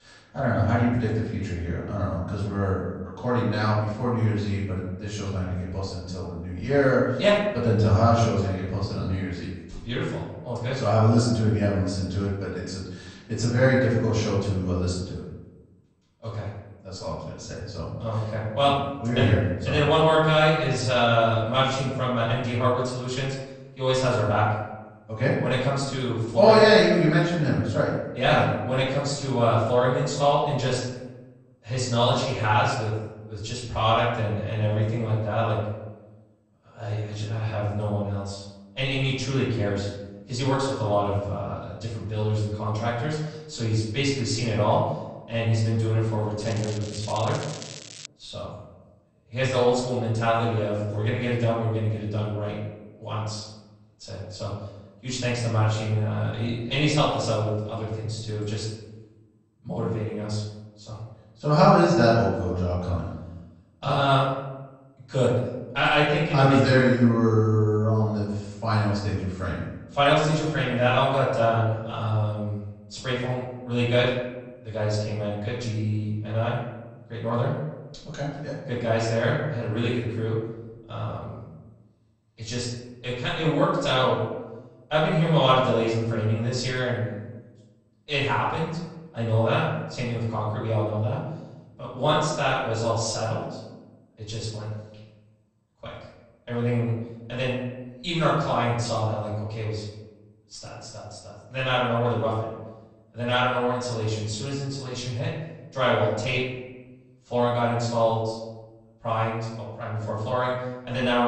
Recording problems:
off-mic speech; far
room echo; noticeable; dies away in 0.9 s
garbled, watery; slightly; nothing above 8.5 kHz
crackling; noticeable; from 46 to 48 s; 15 dB below the speech
abrupt cut into speech; at the end

